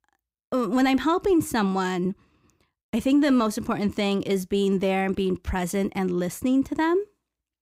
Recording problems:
none

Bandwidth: 15.5 kHz